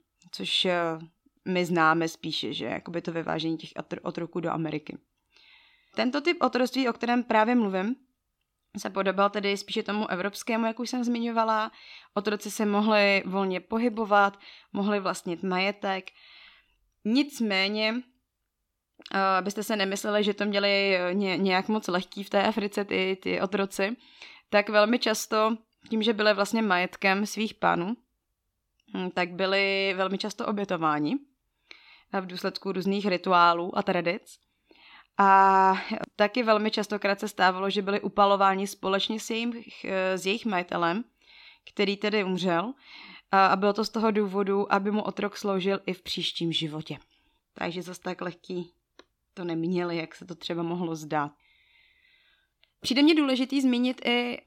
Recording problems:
none

